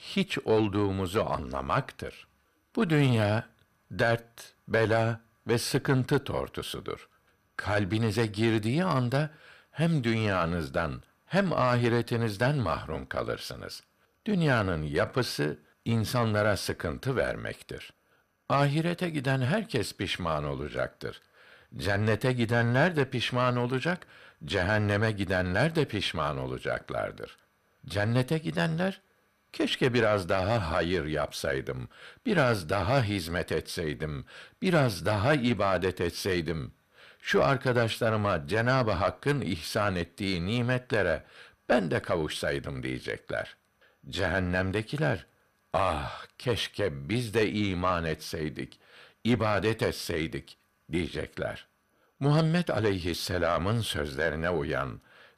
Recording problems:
distortion; slight; 10 dB below the speech

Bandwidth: 14.5 kHz